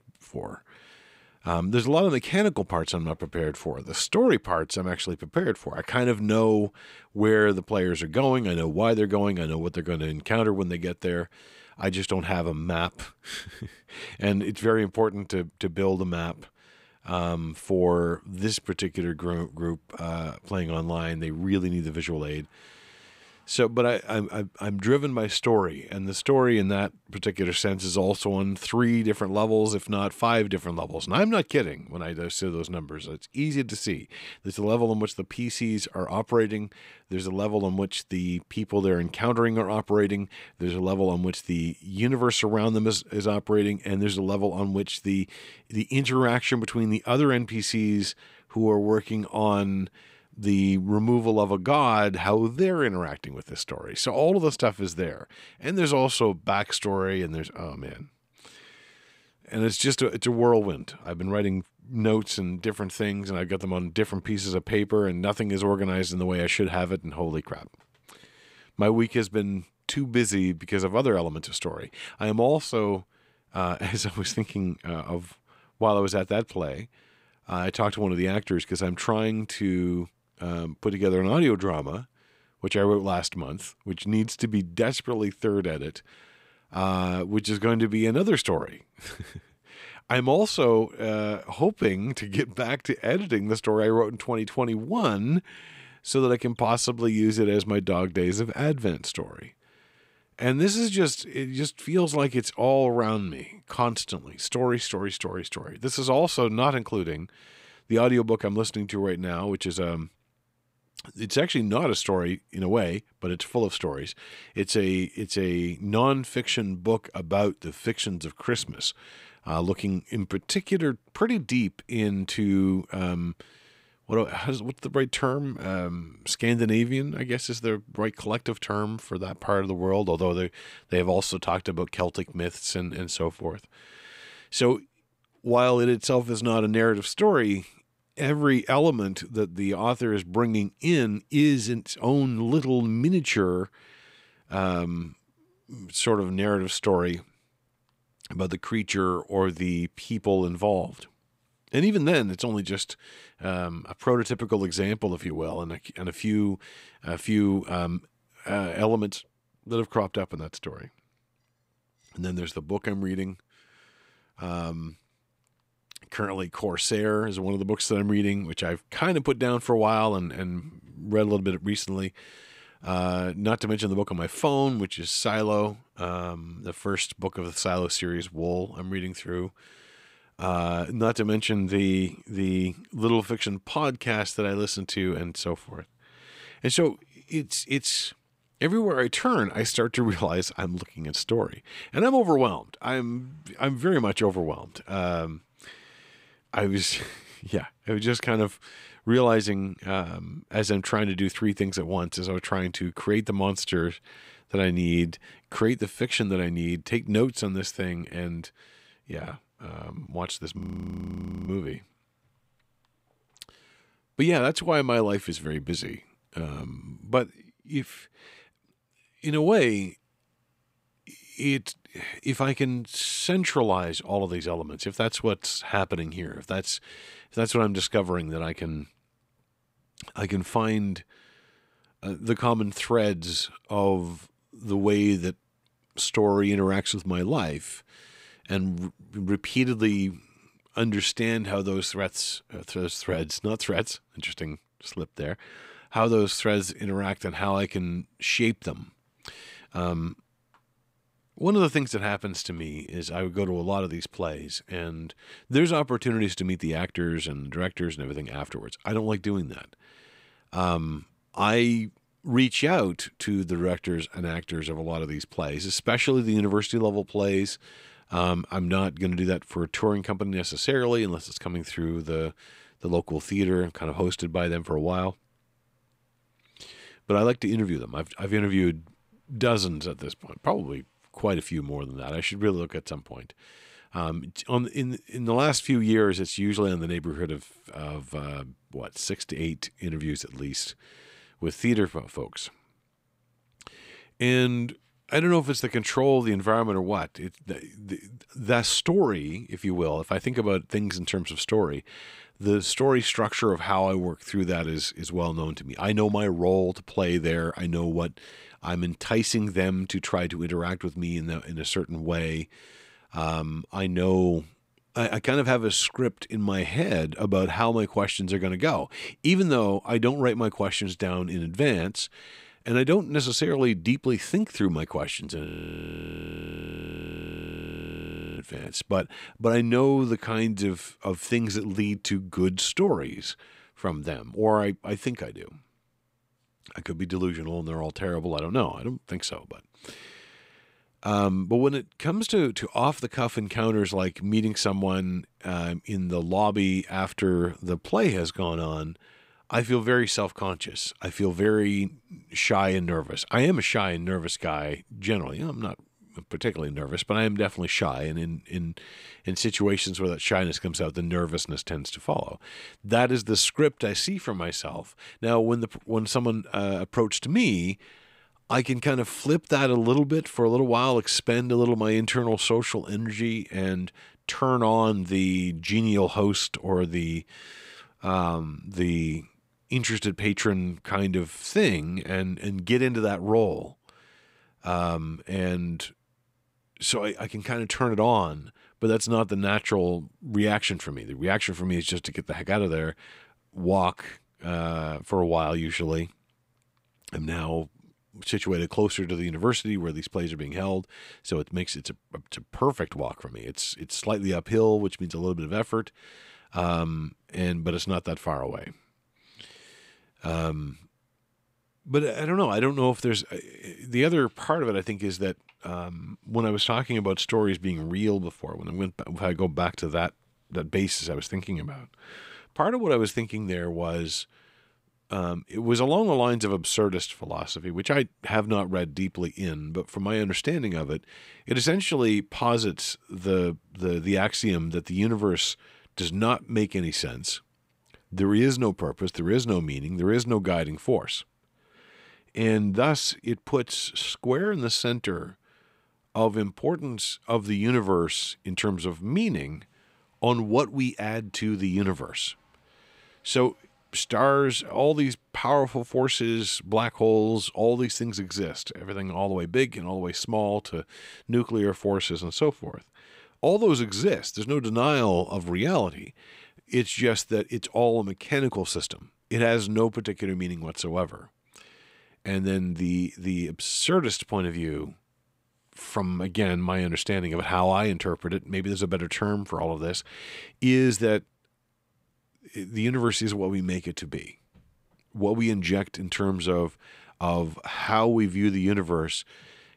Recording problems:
audio freezing; at 3:31 for 1 s and at 5:25 for 3 s

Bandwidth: 15.5 kHz